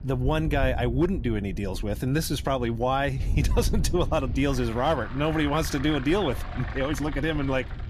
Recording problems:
traffic noise; noticeable; throughout; 15 dB below the speech
wind noise on the microphone; occasional gusts; 20 dB below the speech

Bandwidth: 14.5 kHz